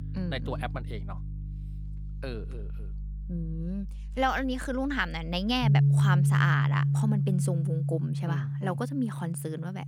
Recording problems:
background music; very loud; throughout; 3 dB above the speech

